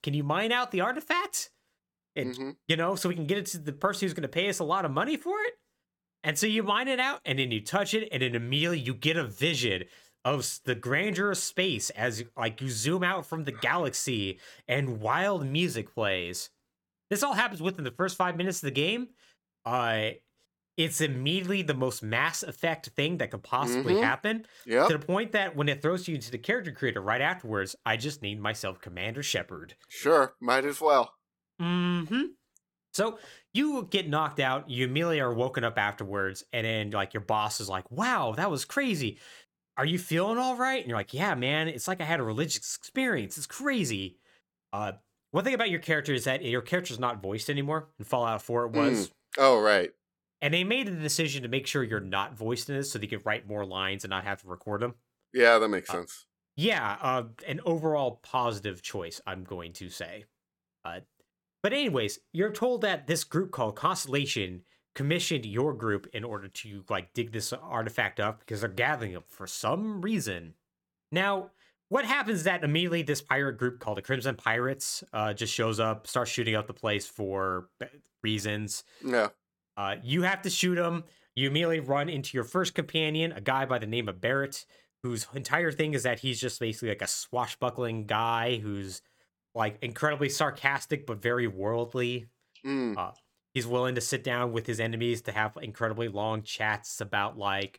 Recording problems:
none

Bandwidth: 17 kHz